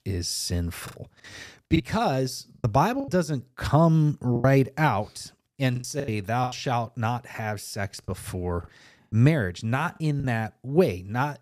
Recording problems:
choppy; very; 8% of the speech affected

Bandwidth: 14.5 kHz